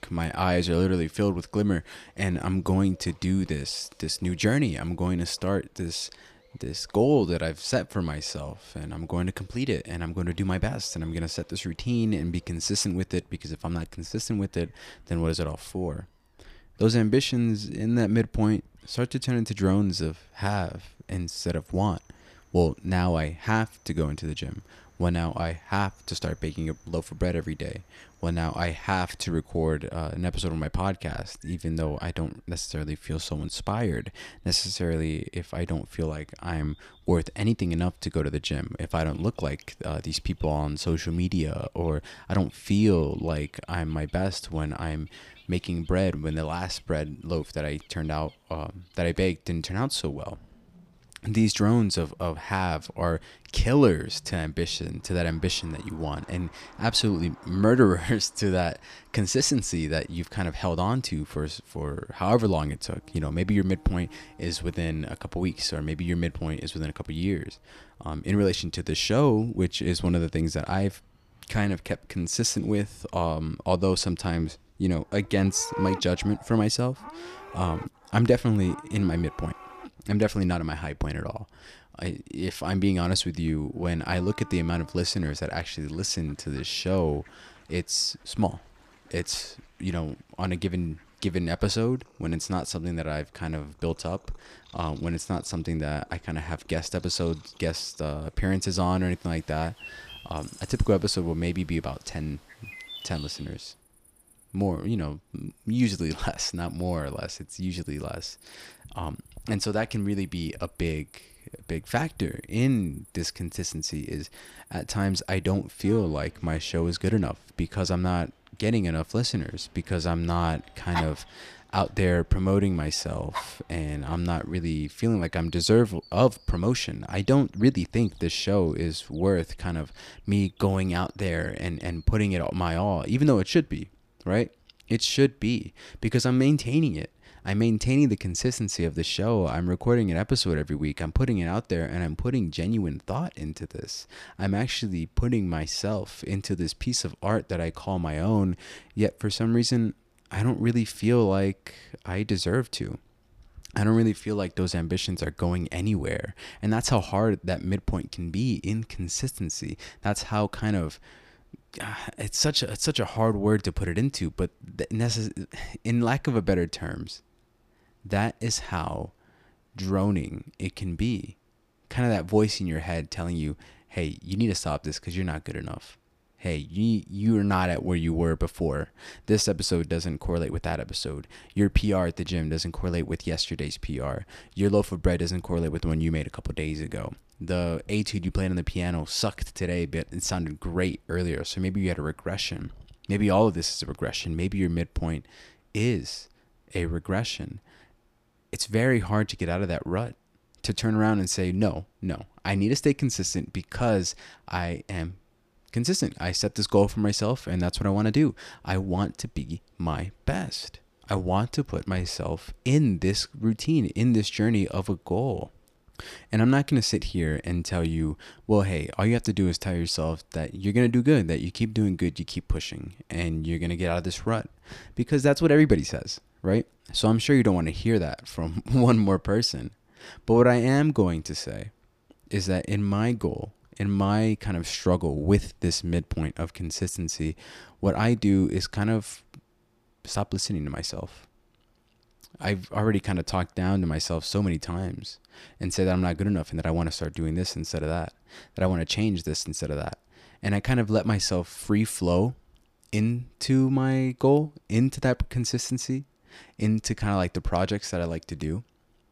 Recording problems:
animal sounds; faint; until 2:13; 20 dB below the speech

